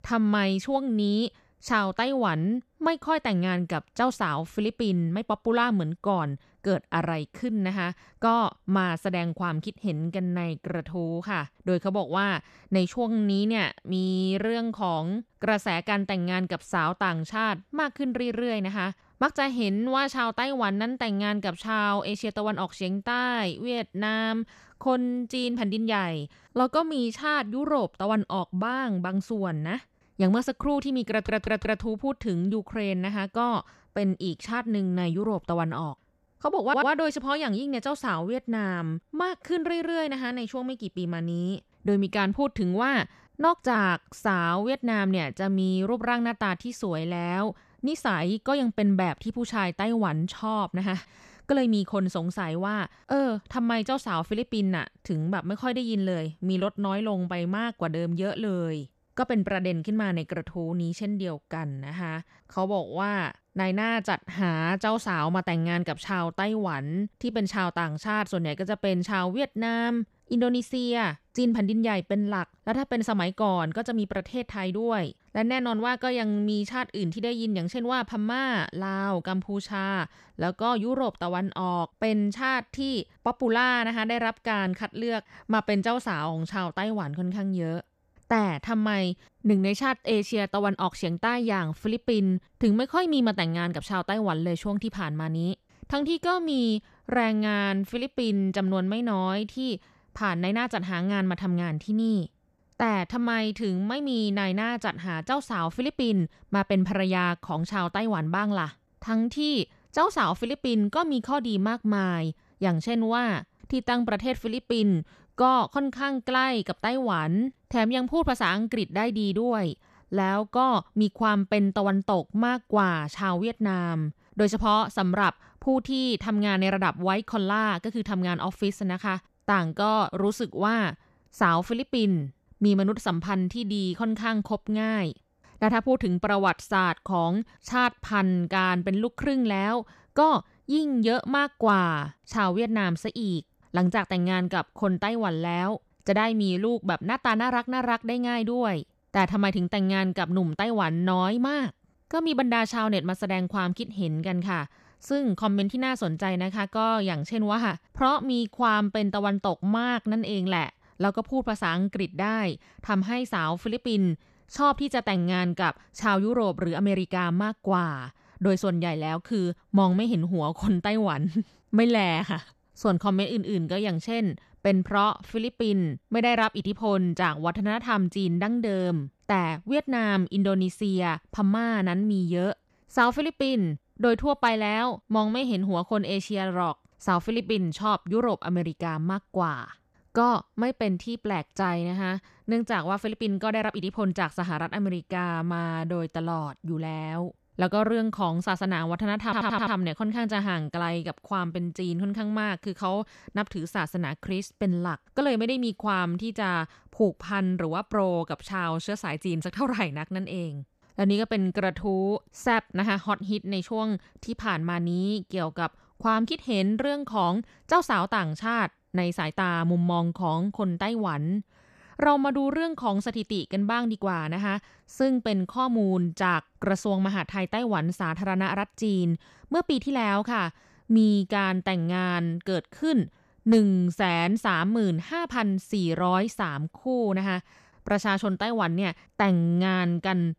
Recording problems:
audio stuttering; at 31 s, at 37 s and at 3:19

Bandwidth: 14 kHz